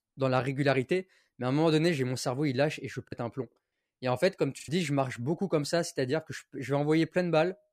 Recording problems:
choppy; very; from 3 to 4.5 s; 10% of the speech affected

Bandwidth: 15 kHz